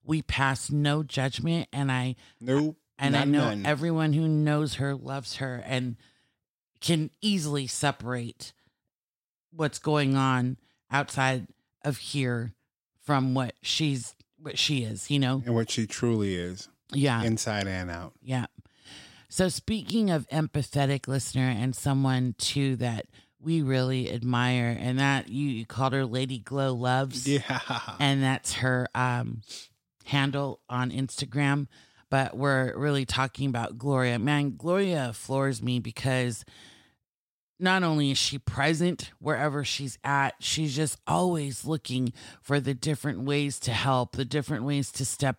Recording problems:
none

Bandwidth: 16 kHz